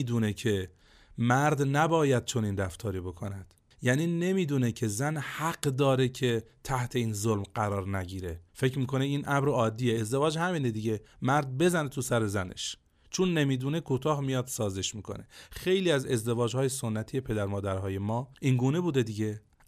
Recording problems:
abrupt cut into speech; at the start

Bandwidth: 14.5 kHz